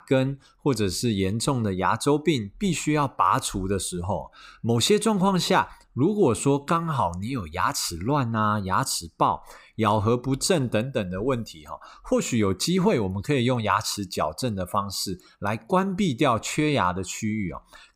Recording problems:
none

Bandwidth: 15.5 kHz